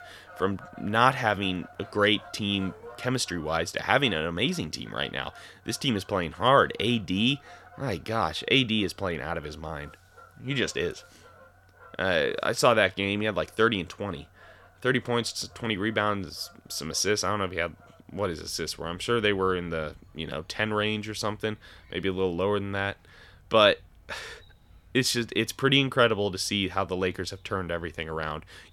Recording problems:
animal sounds; faint; throughout; 25 dB below the speech

